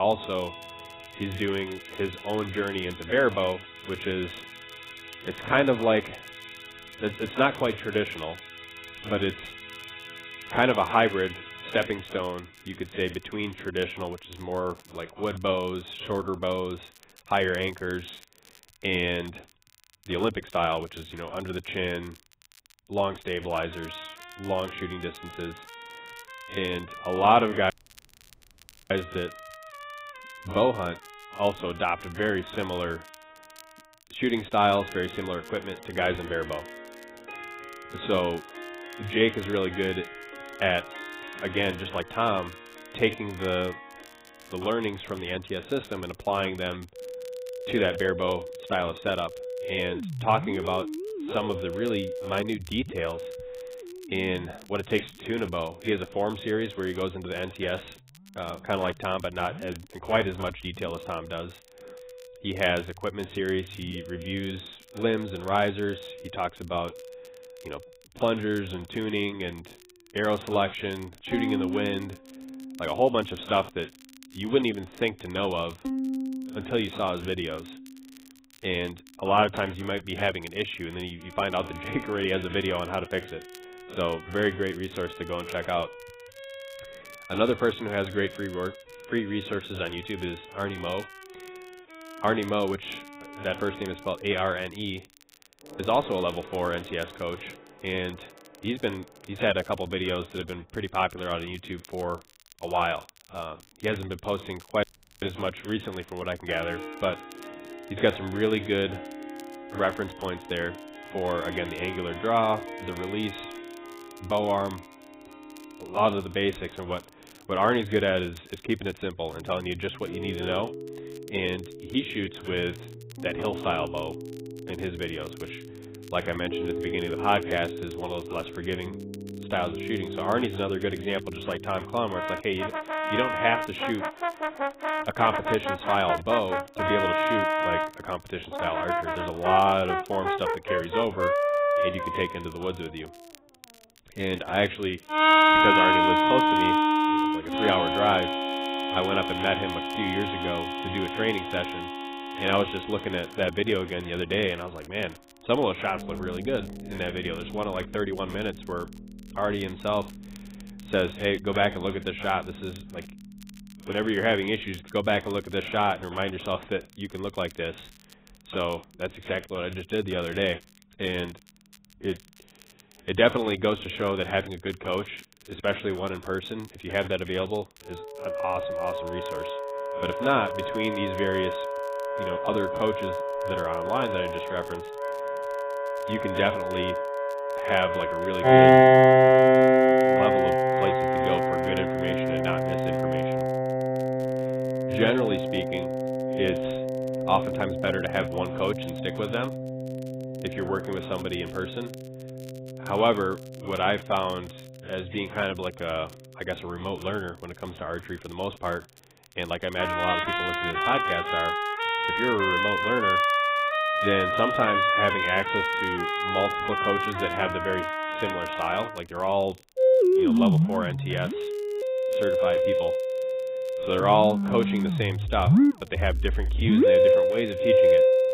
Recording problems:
garbled, watery; badly; nothing above 3.5 kHz
background music; very loud; throughout; 3 dB above the speech
crackle, like an old record; faint; 25 dB below the speech
abrupt cut into speech; at the start
audio cutting out; at 28 s for 1 s and at 1:45

